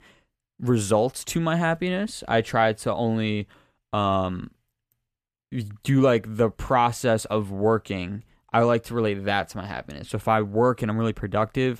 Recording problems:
none

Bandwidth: 14.5 kHz